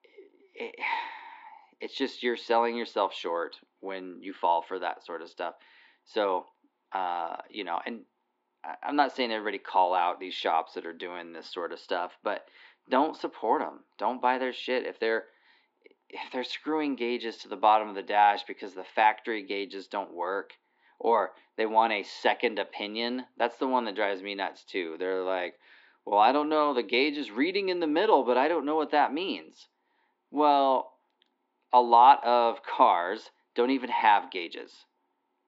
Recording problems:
thin; somewhat; fading below 250 Hz
muffled; very slightly; fading above 4 kHz
high frequencies cut off; slight; nothing above 8 kHz

